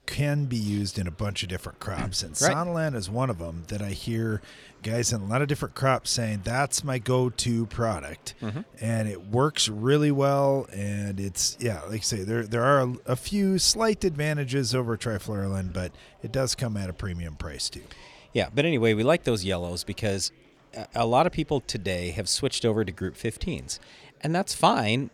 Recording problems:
murmuring crowd; faint; throughout; 30 dB below the speech

